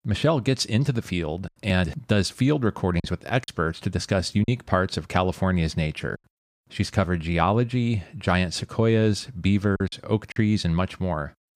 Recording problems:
choppy; occasionally; 3% of the speech affected

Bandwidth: 15 kHz